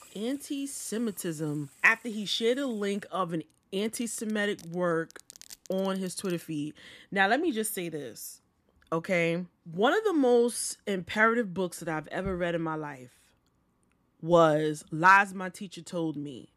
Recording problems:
household noises; faint; until 6.5 s; 25 dB below the speech

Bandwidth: 14.5 kHz